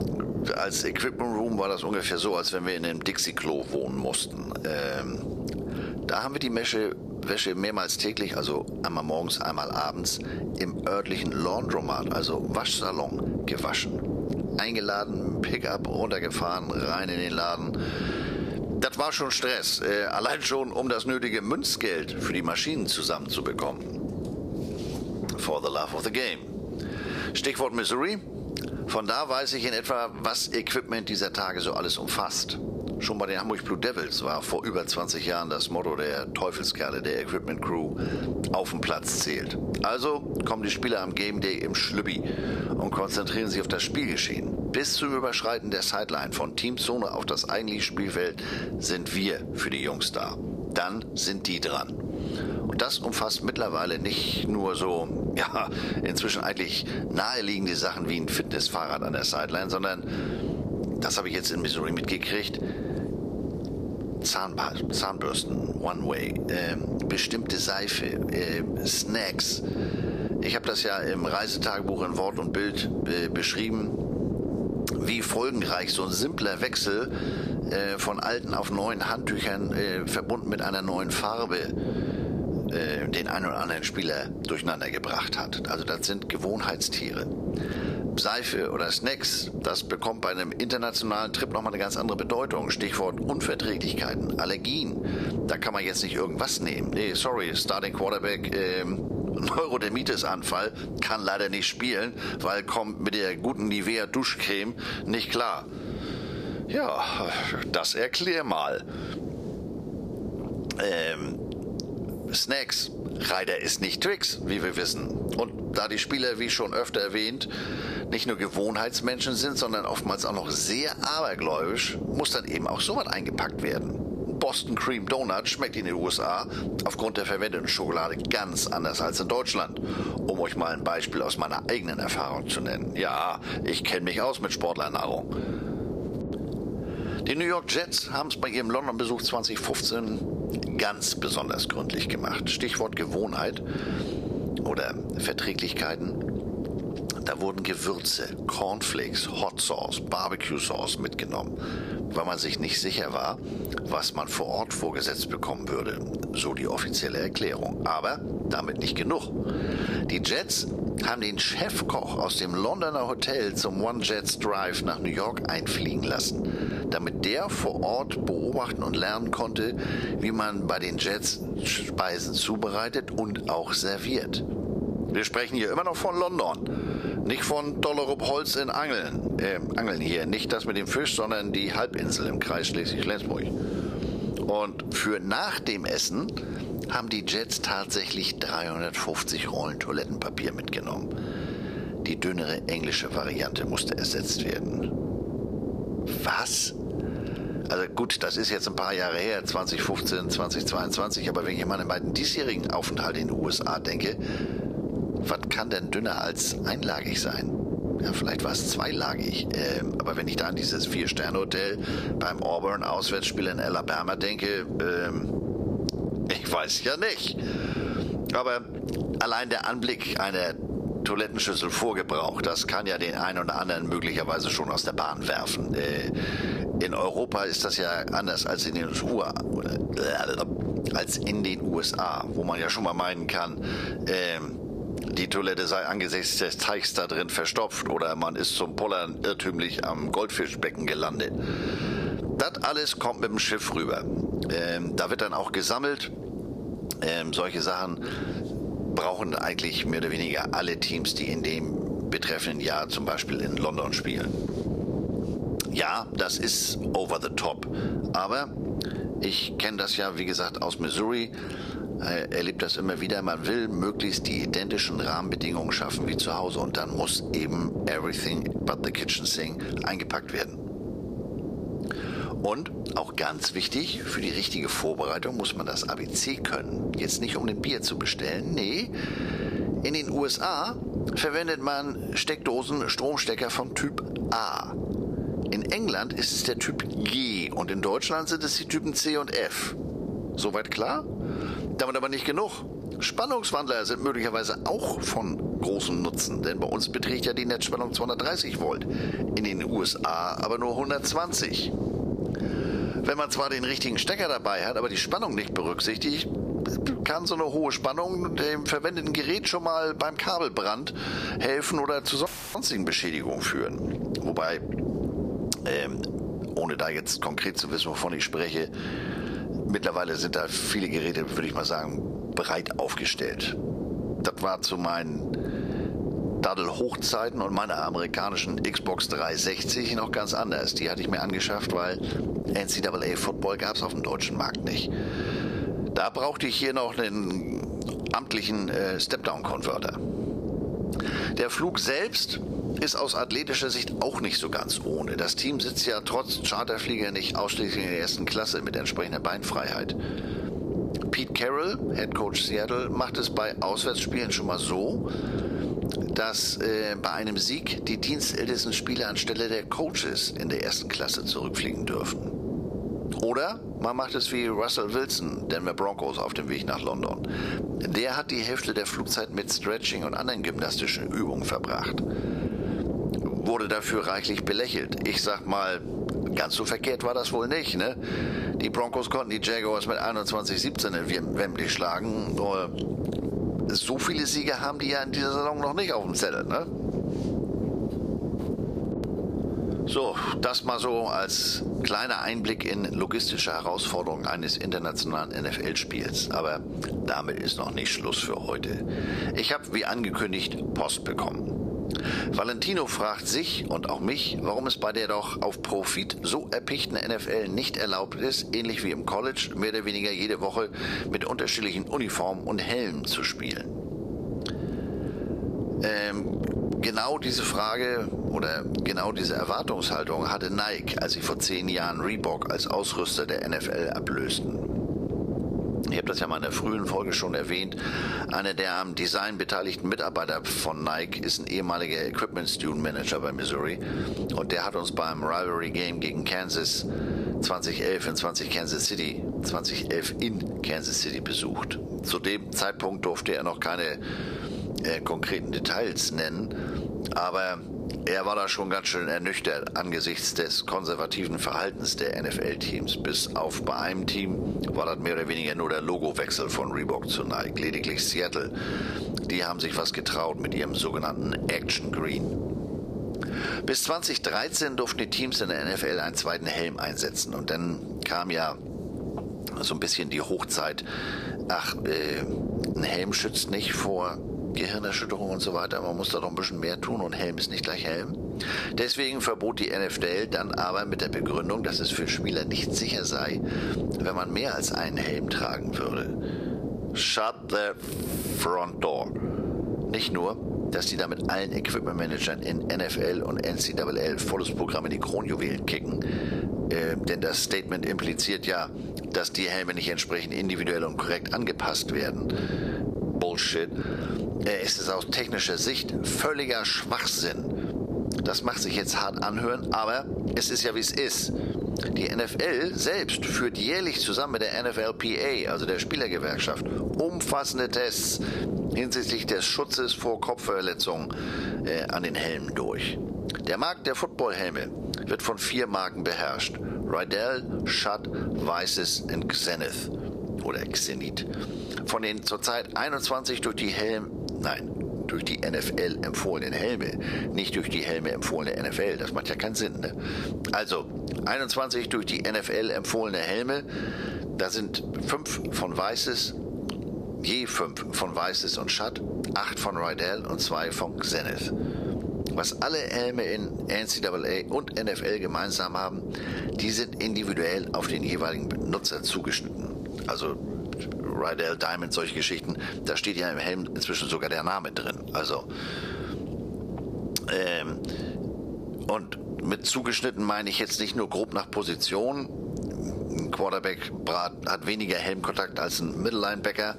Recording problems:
squashed, flat; heavily
thin; somewhat; fading below 500 Hz
wind noise on the microphone; occasional gusts; 10 dB below the speech
audio cutting out; filled with static; at 5:12

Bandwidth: 14.5 kHz